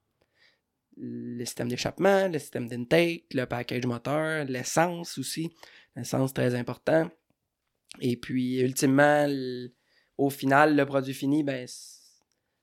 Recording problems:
none

